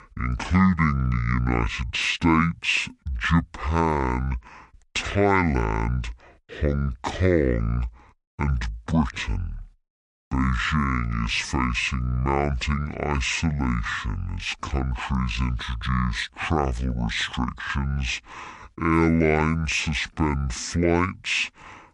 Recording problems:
wrong speed and pitch; too slow and too low; 0.6 times normal speed

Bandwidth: 11 kHz